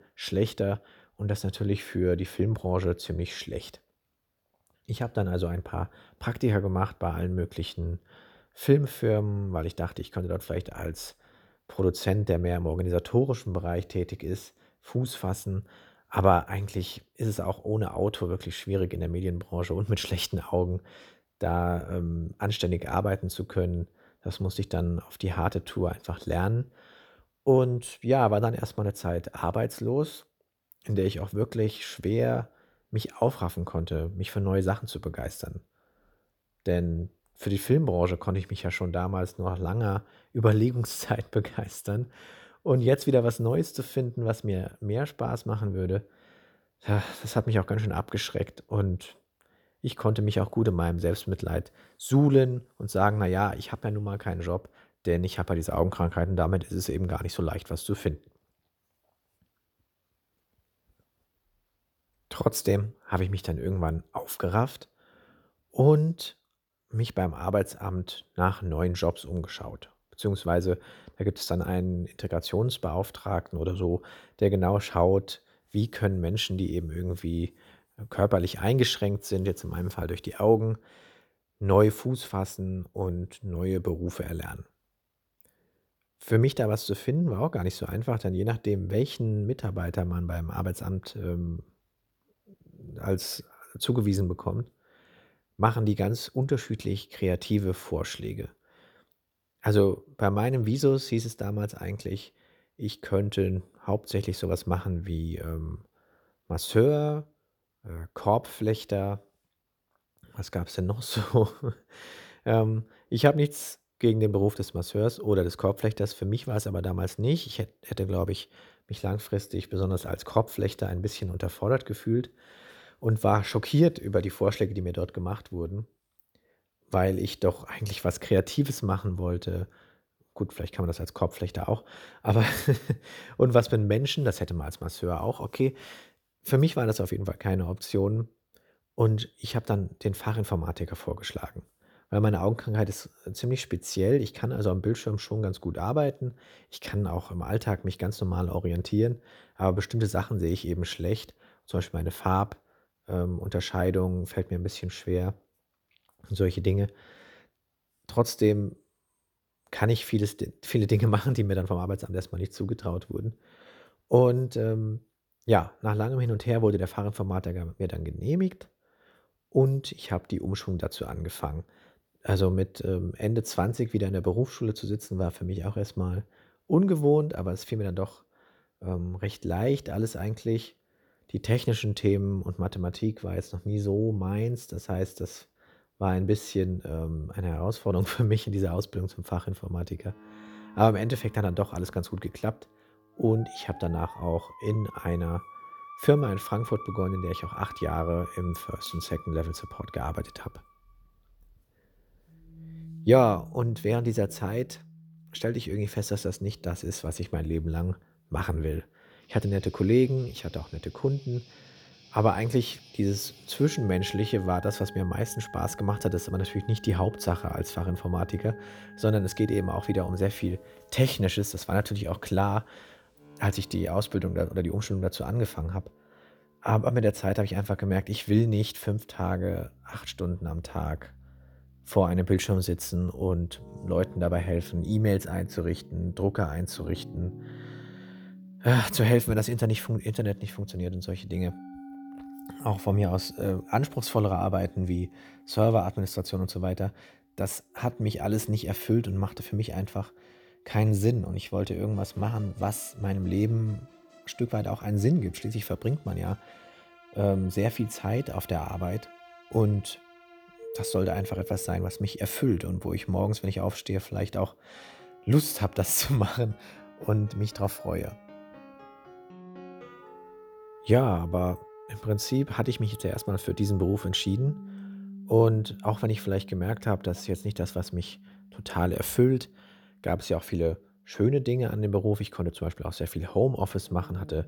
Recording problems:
background music; noticeable; from 3:10 on; 20 dB below the speech

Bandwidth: 19 kHz